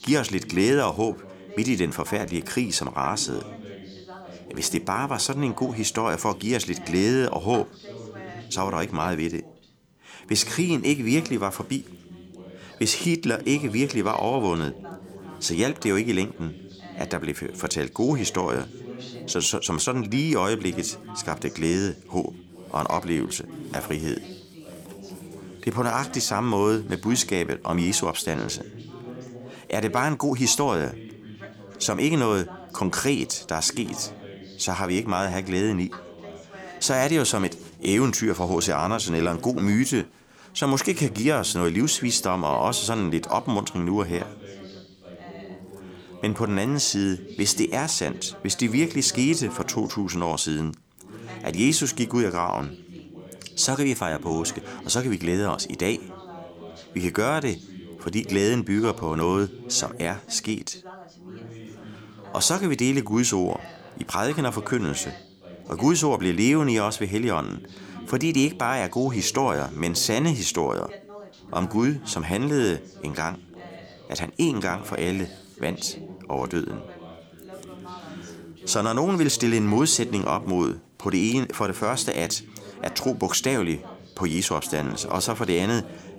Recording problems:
background chatter; noticeable; throughout; 2 voices, 15 dB below the speech

